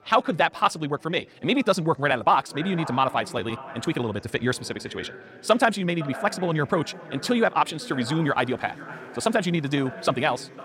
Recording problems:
wrong speed, natural pitch; too fast; 1.6 times normal speed
echo of what is said; noticeable; from 2.5 s on; 510 ms later, 15 dB below the speech
chatter from many people; faint; throughout; 25 dB below the speech

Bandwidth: 16.5 kHz